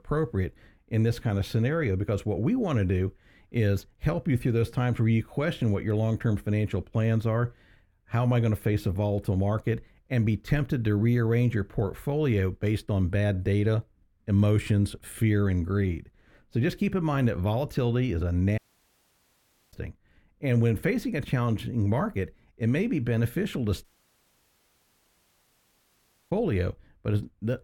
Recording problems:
muffled; slightly; fading above 3 kHz
audio cutting out; at 19 s for 1 s and at 24 s for 2.5 s

